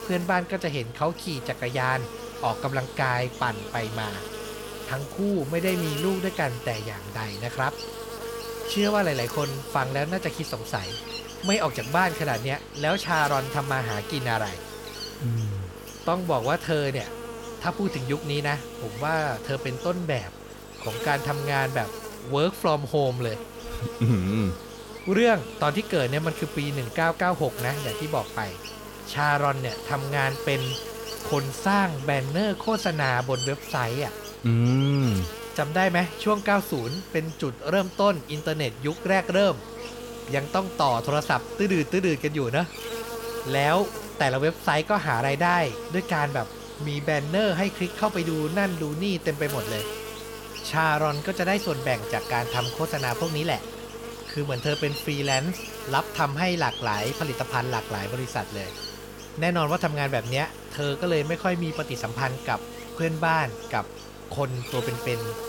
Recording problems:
electrical hum; loud; throughout; 50 Hz, 10 dB below the speech

